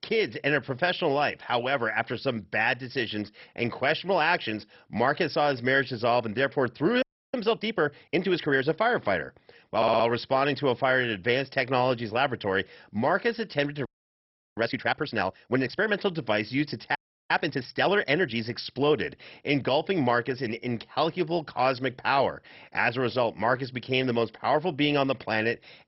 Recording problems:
garbled, watery; badly; nothing above 5.5 kHz
audio freezing; at 7 s, at 14 s for 0.5 s and at 17 s
audio stuttering; at 10 s

